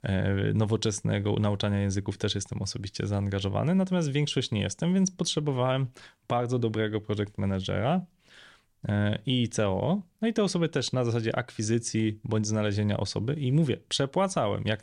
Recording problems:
none

